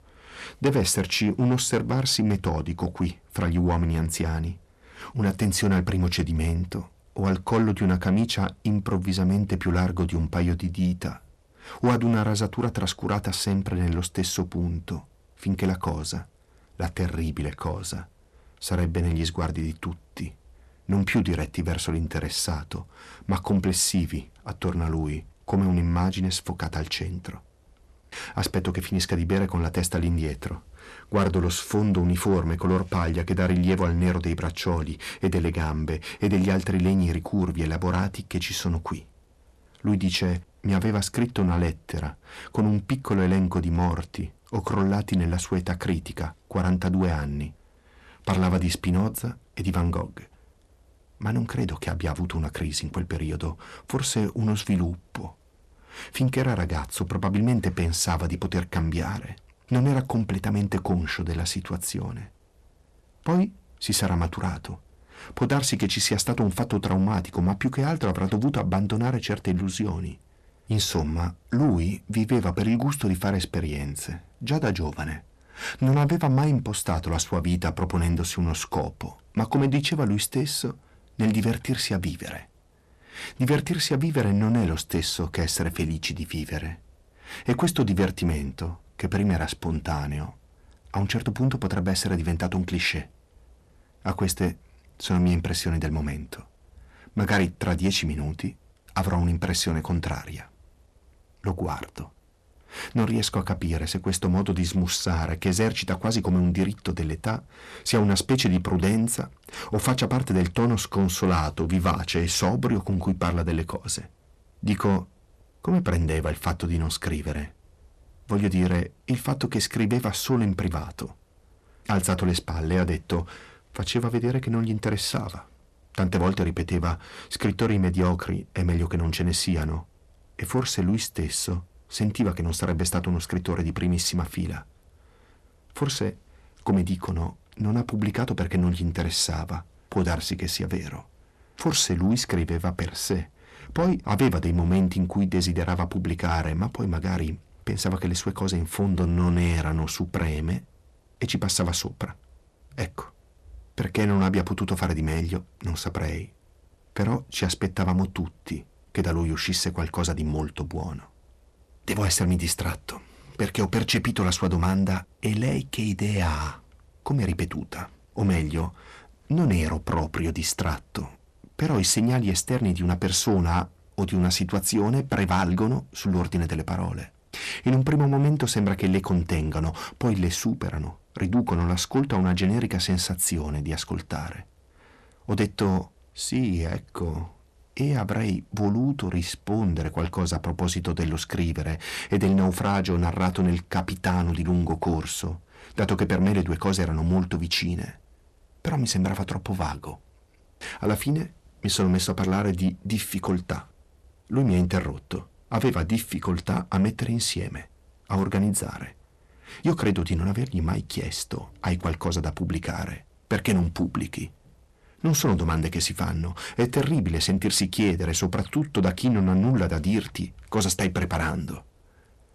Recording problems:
distortion; slight; 10 dB below the speech

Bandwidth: 13.5 kHz